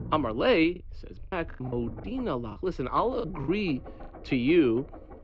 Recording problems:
muffled; slightly; fading above 3 kHz
high frequencies cut off; slight; nothing above 8 kHz
low rumble; noticeable; throughout; 20 dB below the speech
choppy; very; 9% of the speech affected

